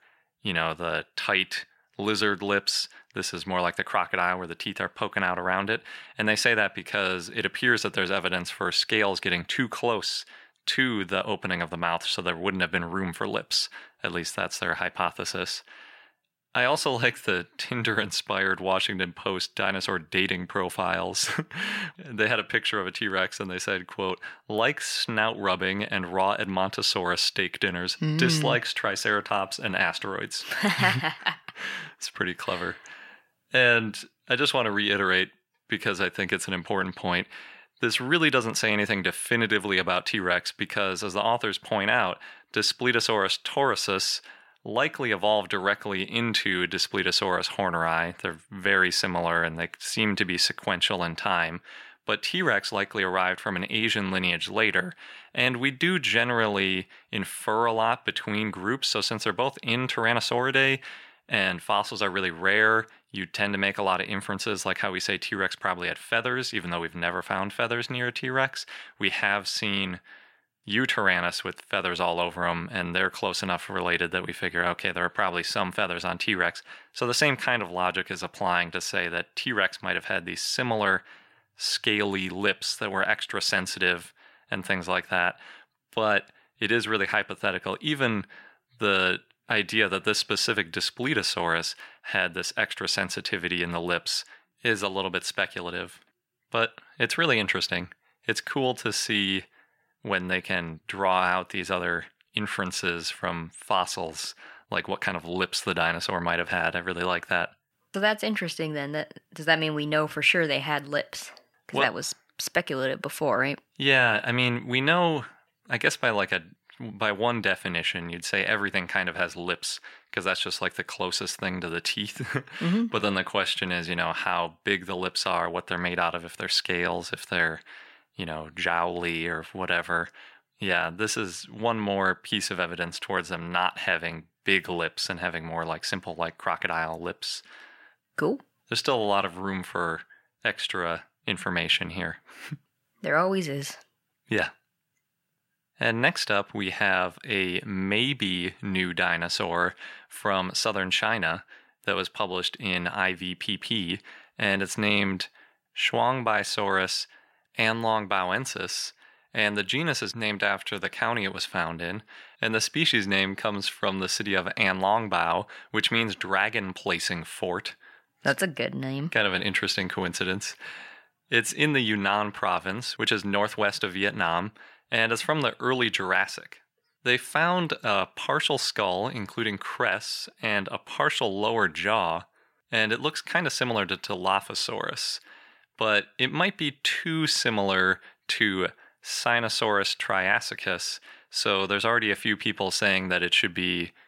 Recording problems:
thin; somewhat; fading below 650 Hz

